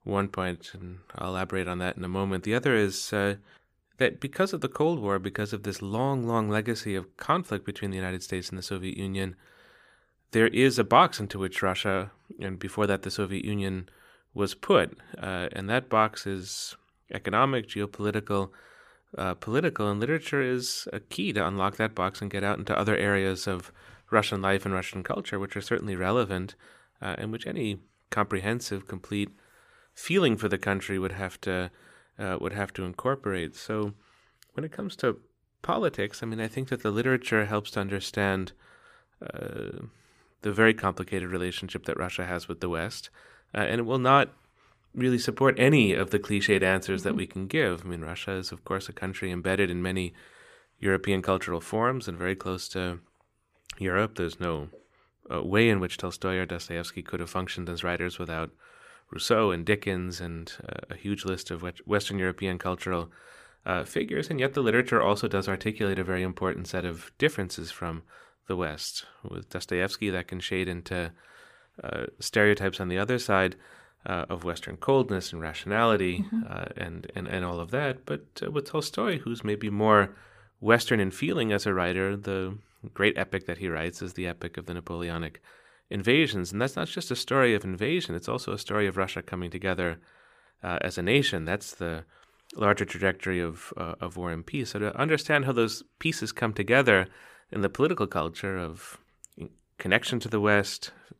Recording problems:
none

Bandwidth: 15 kHz